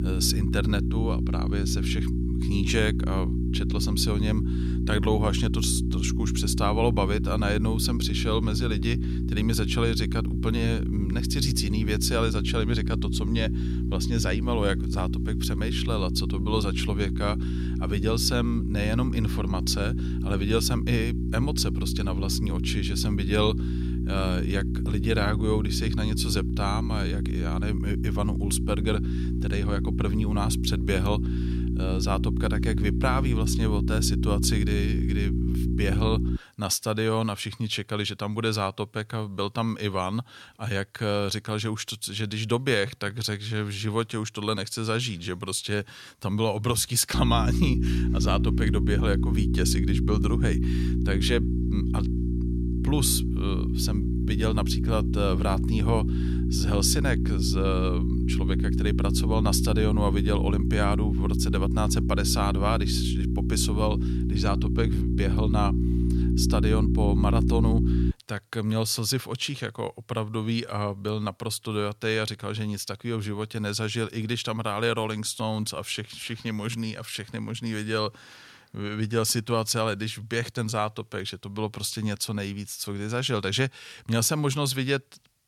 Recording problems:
electrical hum; loud; until 36 s and from 47 s to 1:08; 60 Hz, 6 dB below the speech

